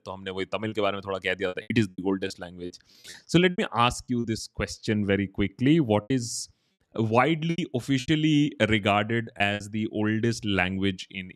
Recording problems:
choppy; very; from 0.5 to 4 s, at 6 s and from 7.5 to 9.5 s; 10% of the speech affected

